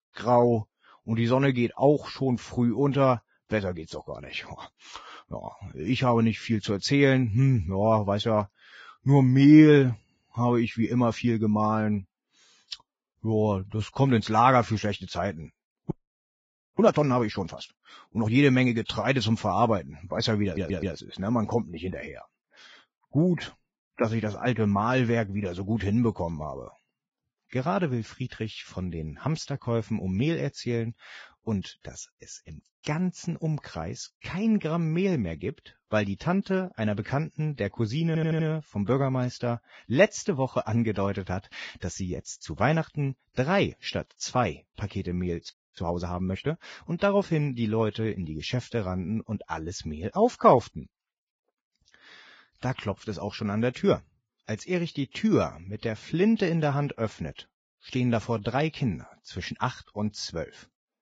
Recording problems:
garbled, watery; badly; nothing above 7.5 kHz
audio freezing; at 16 s for 1 s and at 46 s
audio stuttering; at 20 s and at 38 s

